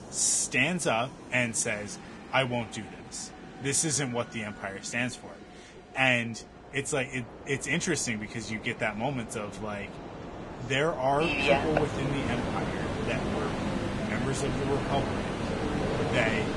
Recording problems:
garbled, watery; badly; nothing above 10 kHz
train or aircraft noise; loud; throughout; 3 dB below the speech

